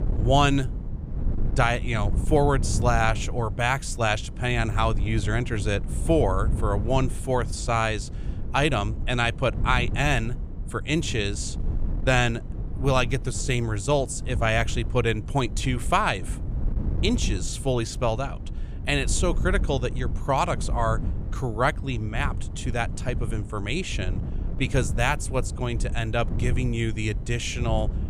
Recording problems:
wind noise on the microphone; occasional gusts; 15 dB below the speech

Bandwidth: 15 kHz